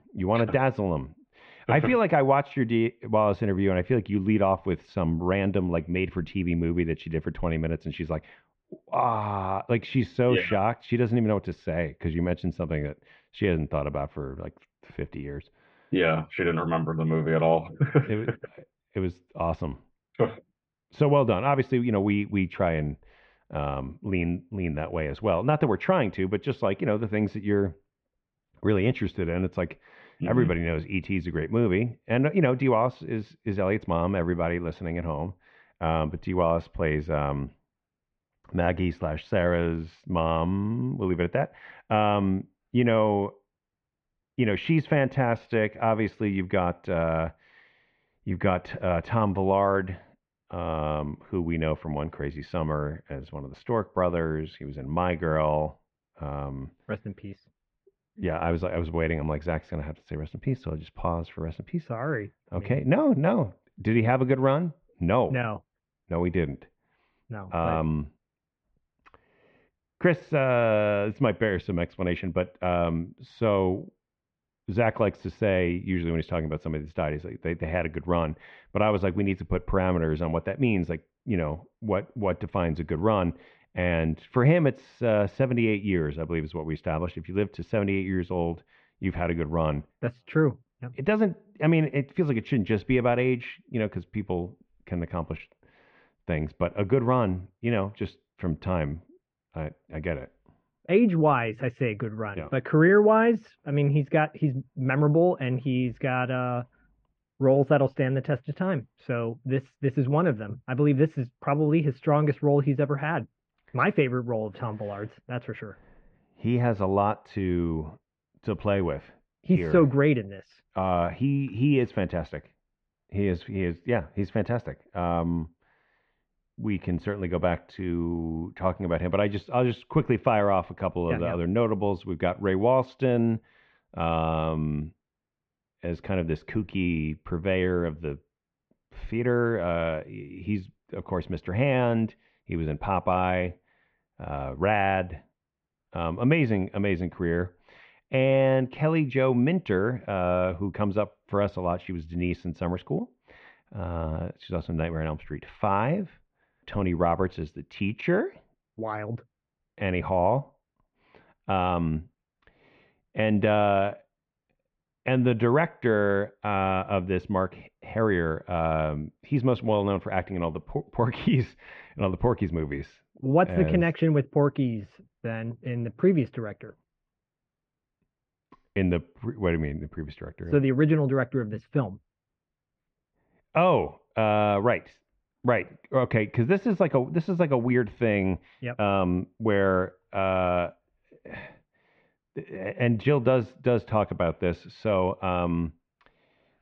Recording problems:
muffled; very; fading above 2.5 kHz

